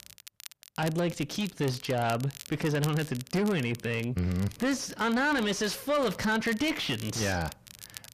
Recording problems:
distortion; heavy; 7 dB below the speech
crackle, like an old record; noticeable; 15 dB below the speech

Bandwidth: 14.5 kHz